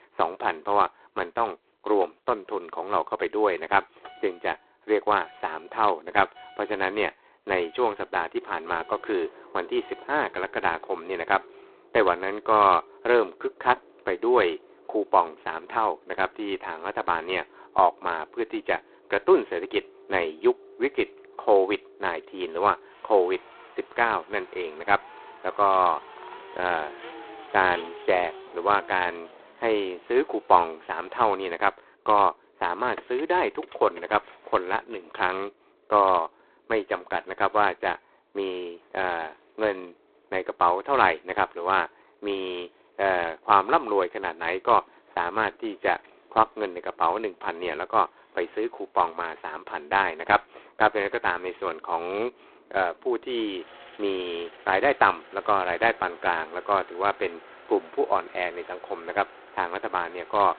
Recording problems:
phone-call audio; poor line; nothing above 4 kHz
traffic noise; faint; throughout; 25 dB below the speech

